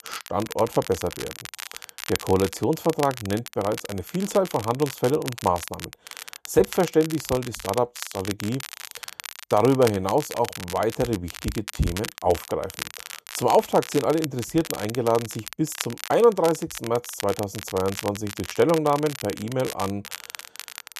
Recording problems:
crackle, like an old record; noticeable; 10 dB below the speech

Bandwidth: 13.5 kHz